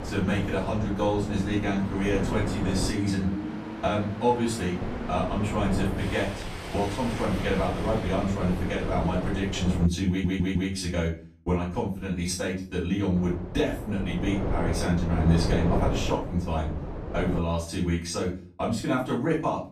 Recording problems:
off-mic speech; far
room echo; slight; dies away in 0.3 s
wind noise on the microphone; heavy; until 3 s, from 5 to 10 s and from 13 to 17 s; 7 dB below the speech
train or aircraft noise; loud; until 9.5 s; 9 dB below the speech
audio stuttering; at 10 s

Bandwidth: 14.5 kHz